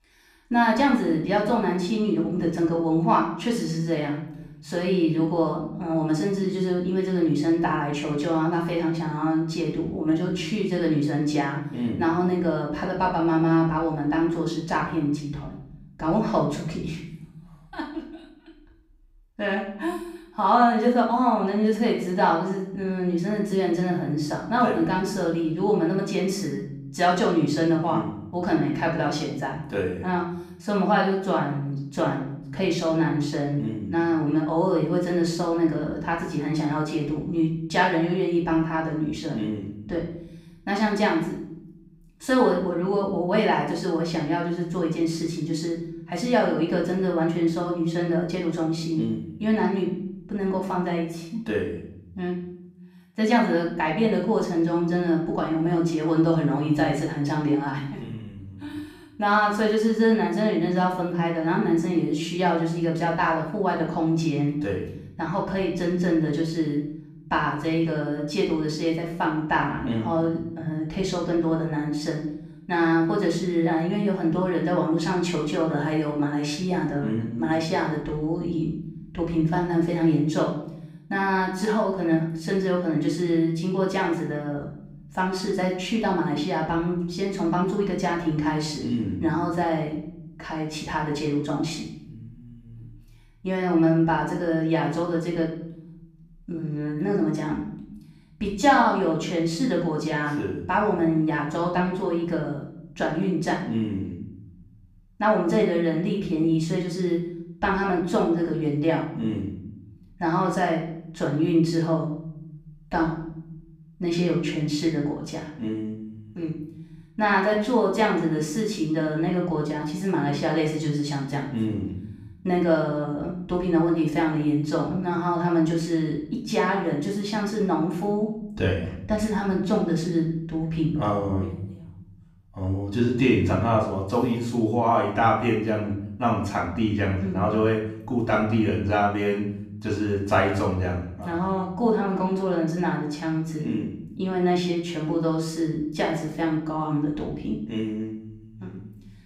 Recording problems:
off-mic speech; far
room echo; noticeable; dies away in 0.9 s

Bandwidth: 15.5 kHz